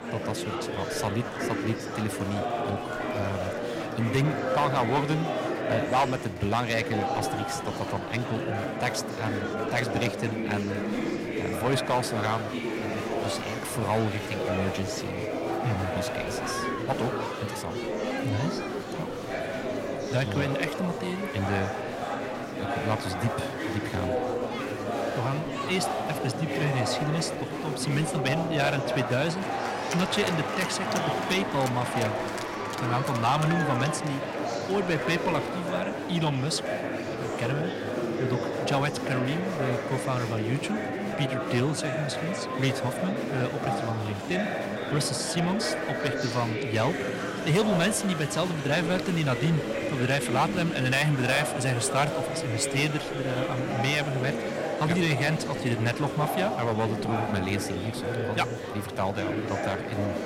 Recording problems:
distortion; slight; 2% of the sound clipped
murmuring crowd; loud; throughout; 2 dB below the speech

